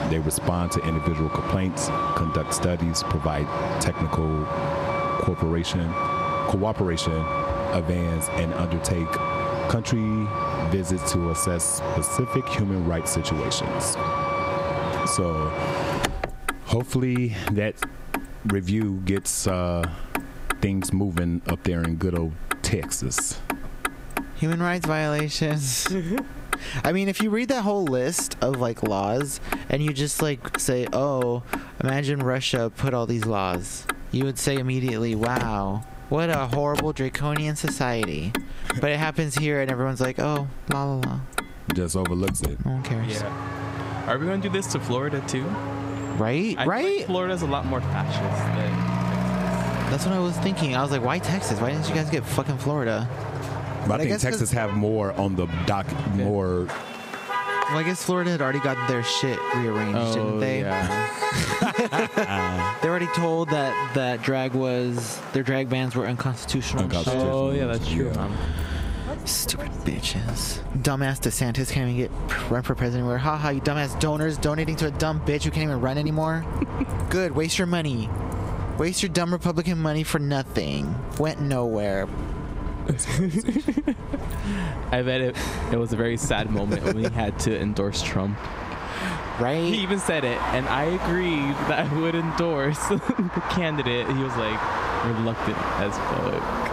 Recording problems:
squashed, flat; heavily, background pumping
traffic noise; loud; throughout; 5 dB below the speech

